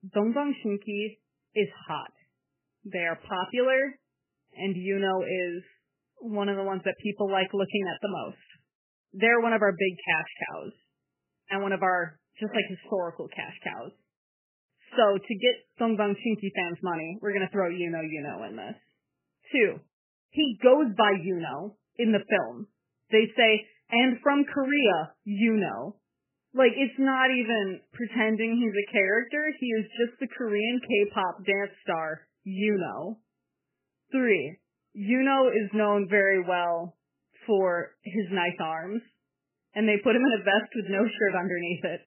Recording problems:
garbled, watery; badly; nothing above 3 kHz

